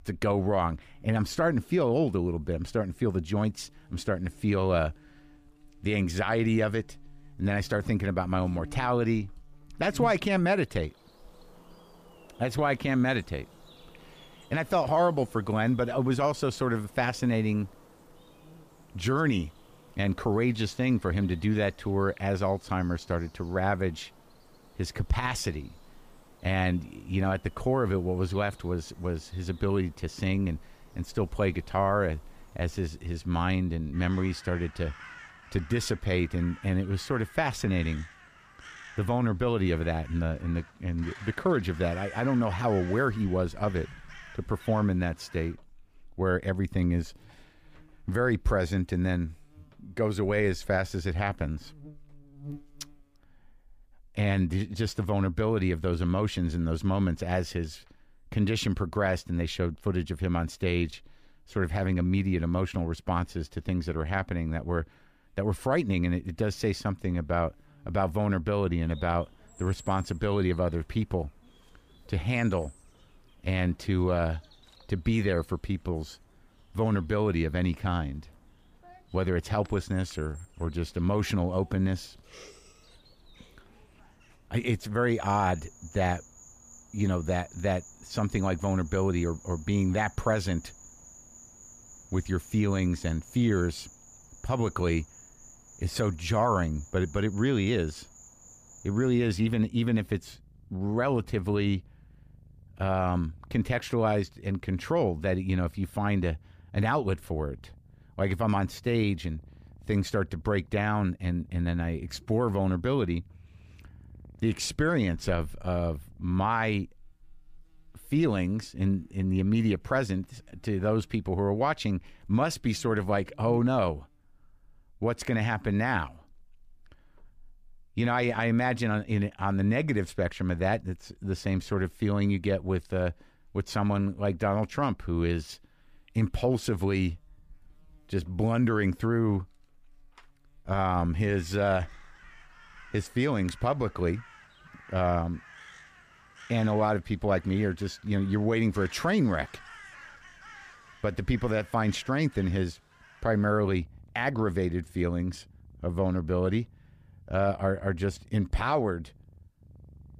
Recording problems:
animal sounds; faint; throughout; 25 dB below the speech

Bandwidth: 15 kHz